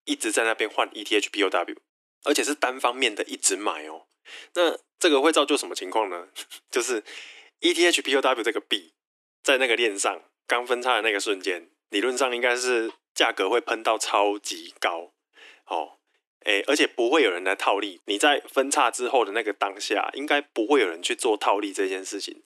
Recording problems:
thin; very; fading below 300 Hz

